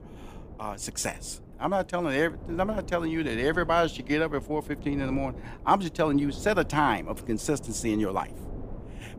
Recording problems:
wind noise on the microphone; occasional gusts; 20 dB below the speech

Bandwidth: 15 kHz